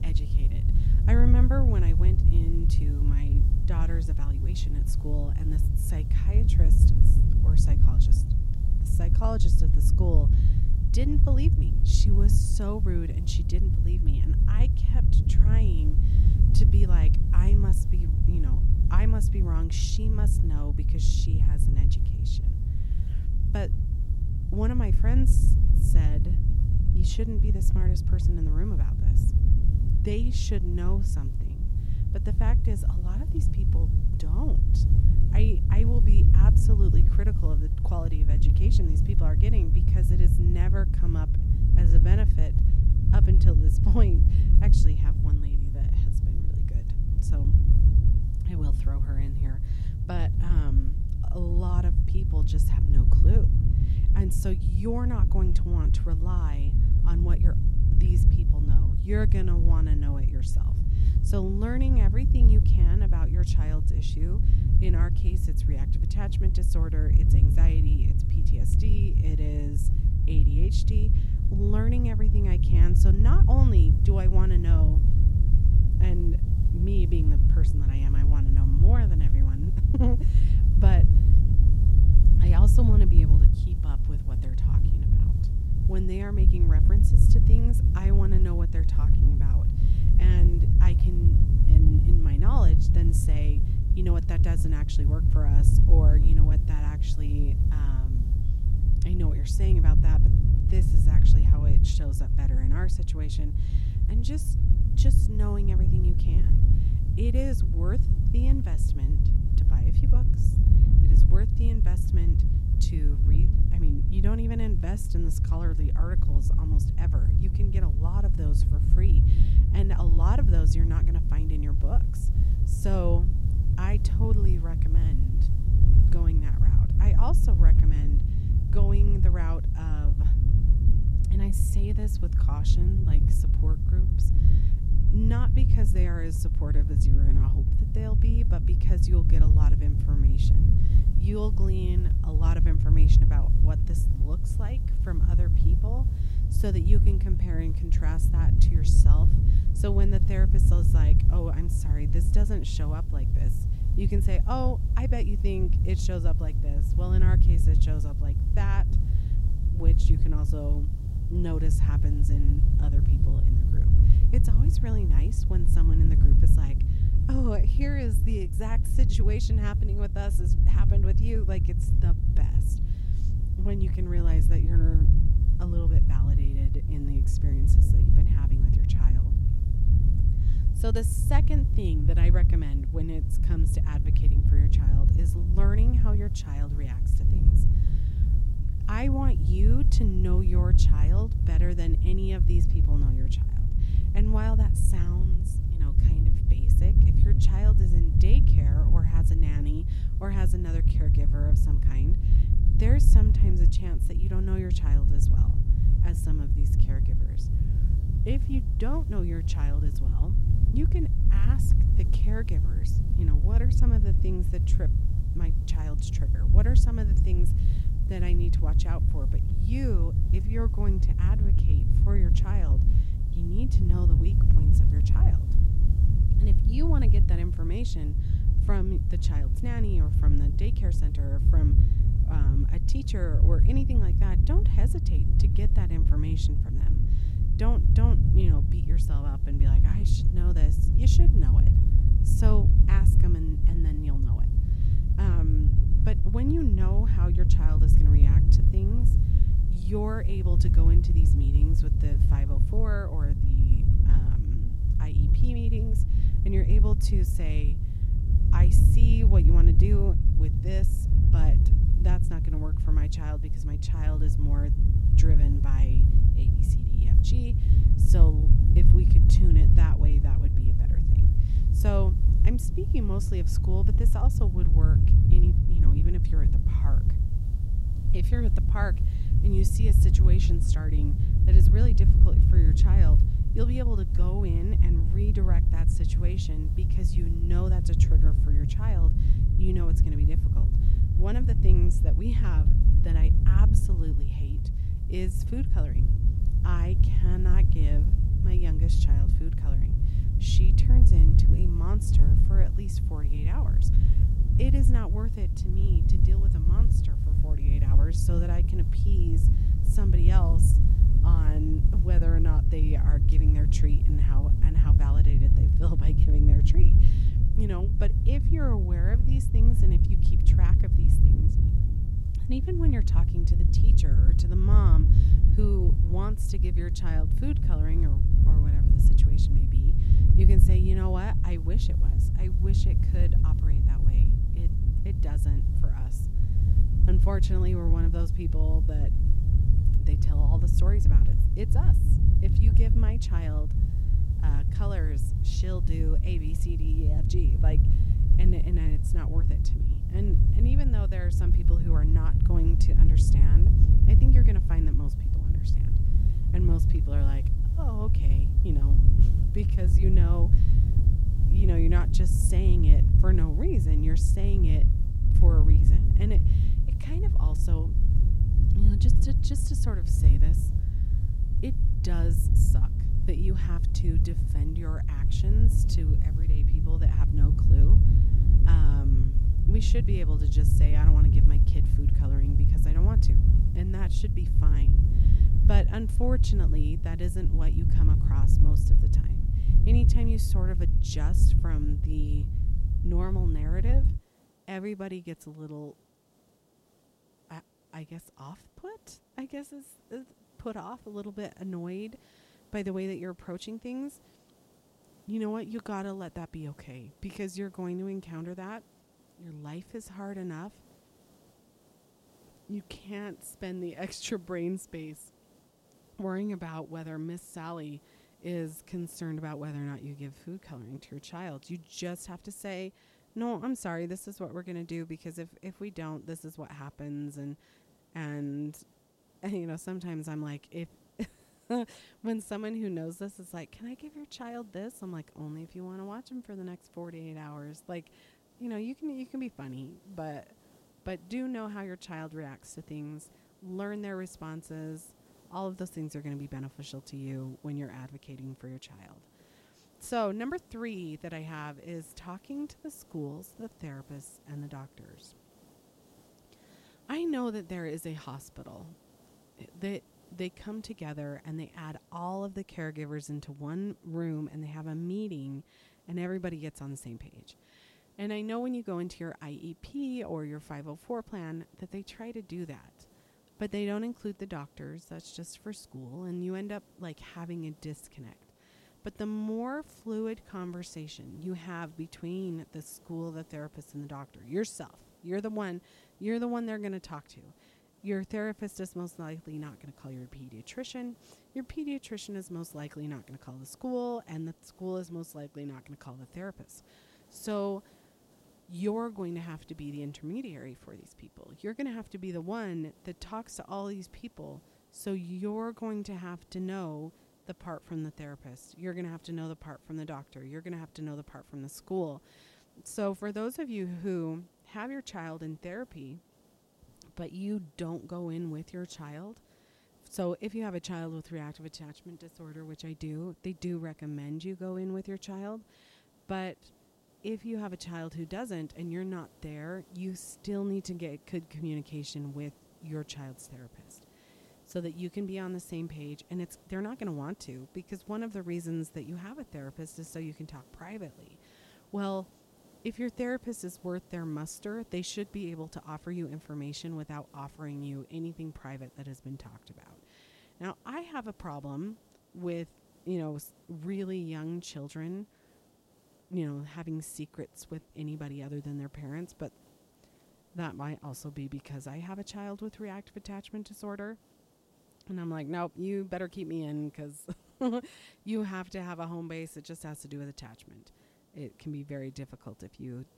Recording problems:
low rumble; loud; until 6:34; as loud as the speech
hiss; faint; throughout; 25 dB below the speech

